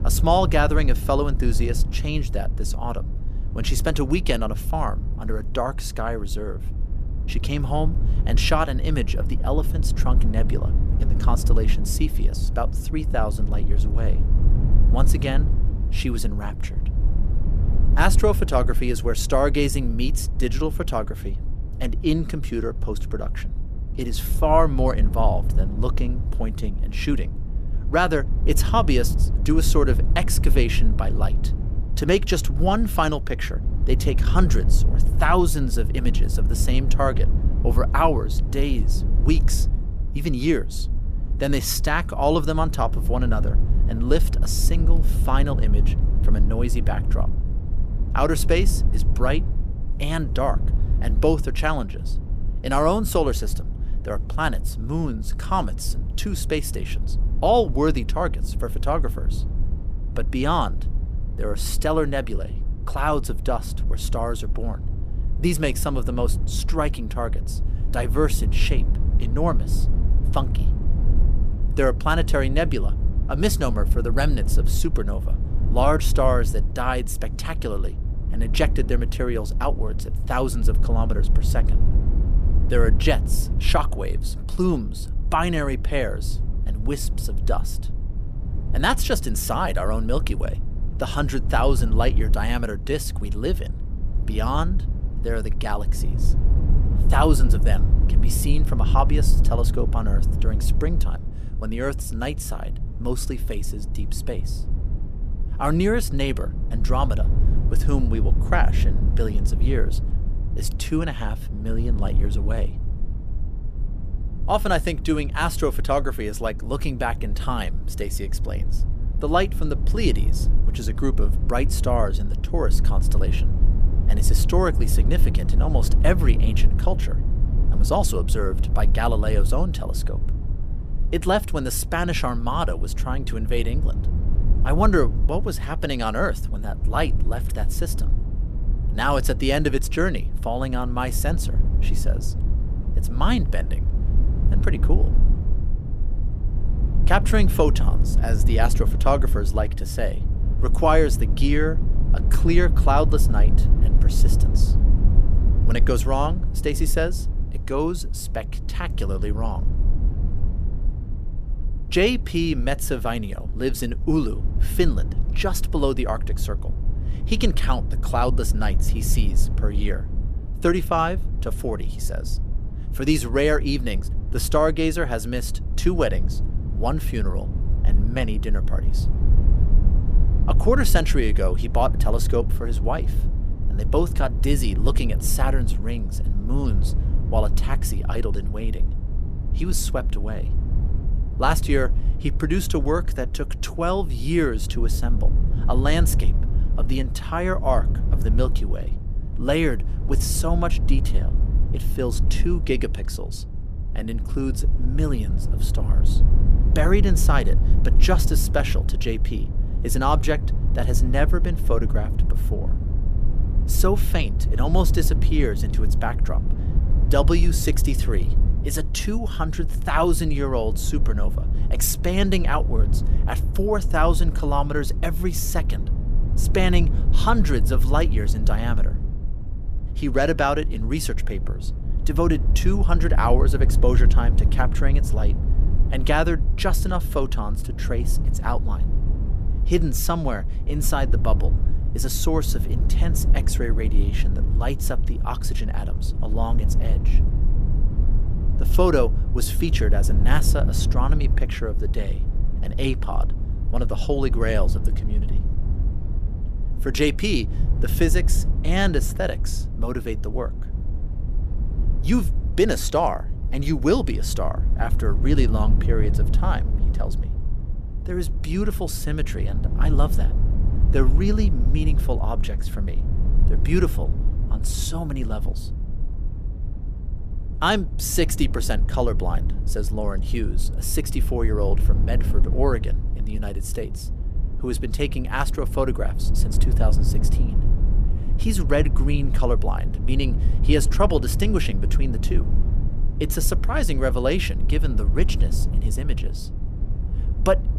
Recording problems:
low rumble; noticeable; throughout; 15 dB below the speech

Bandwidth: 14.5 kHz